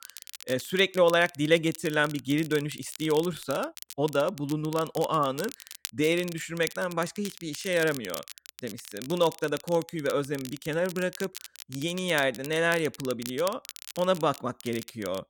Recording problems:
crackle, like an old record; noticeable; 15 dB below the speech

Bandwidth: 17.5 kHz